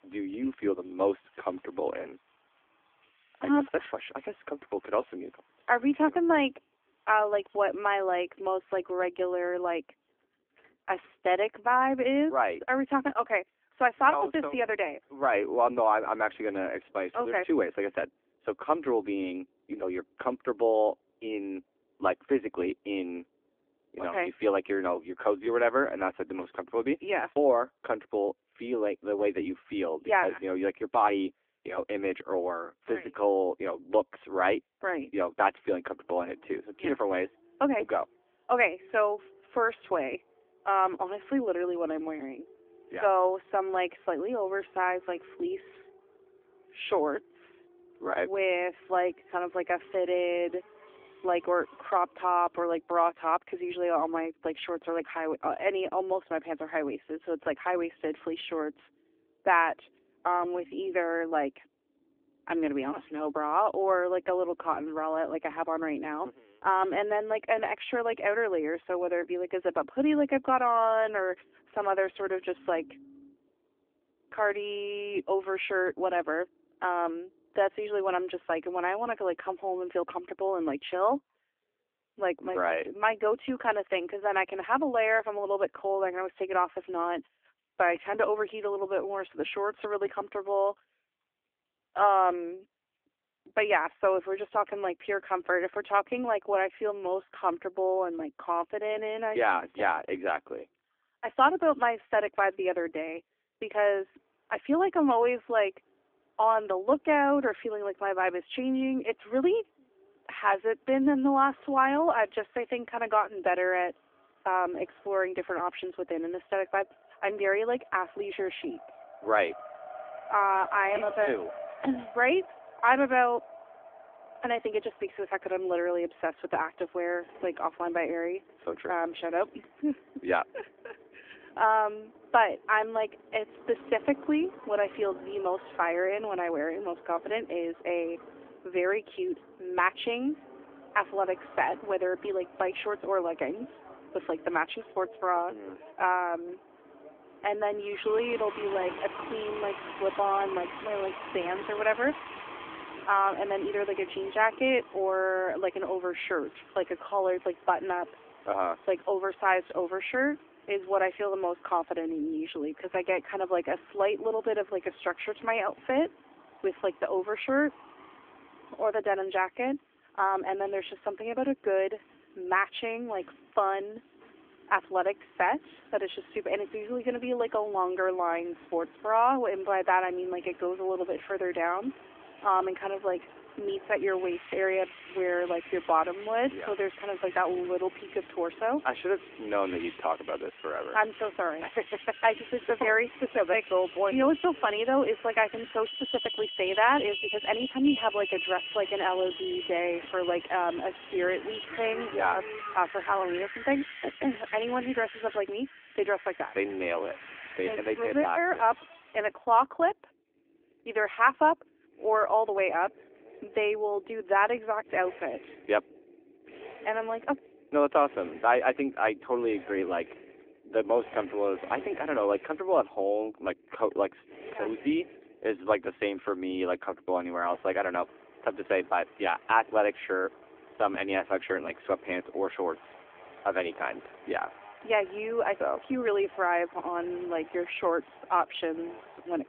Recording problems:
phone-call audio
traffic noise; noticeable; throughout; 15 dB below the speech

